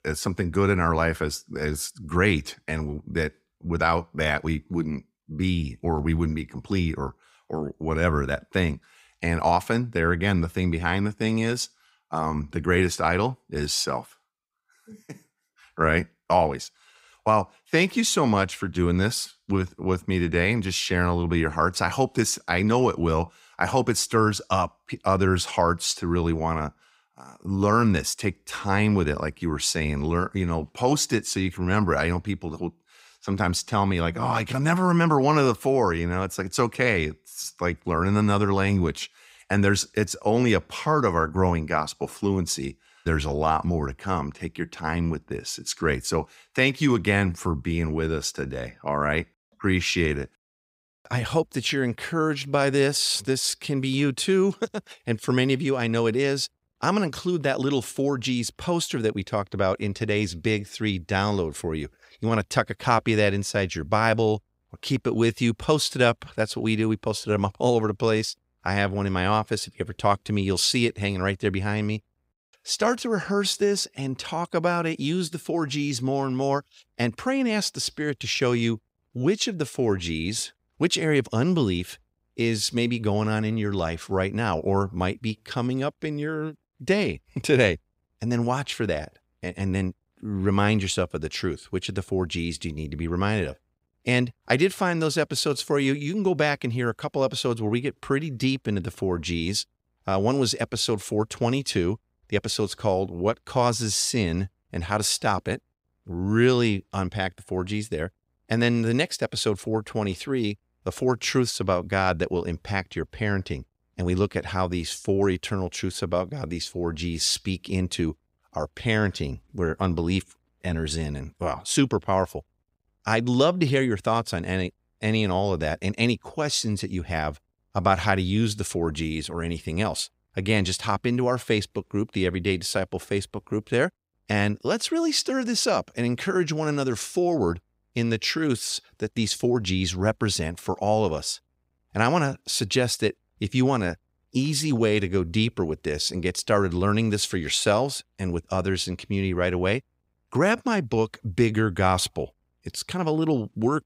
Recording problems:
none

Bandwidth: 15.5 kHz